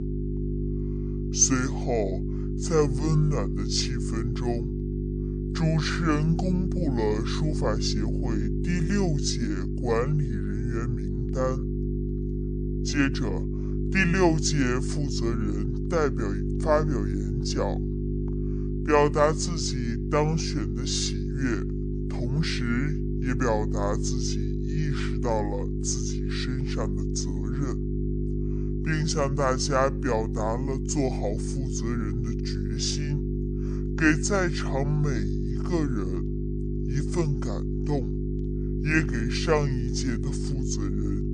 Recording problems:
wrong speed and pitch; too slow and too low; 0.6 times normal speed
electrical hum; loud; throughout; 50 Hz, 8 dB below the speech

